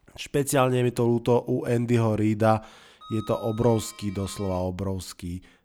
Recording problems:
household noises; faint; throughout; 20 dB below the speech

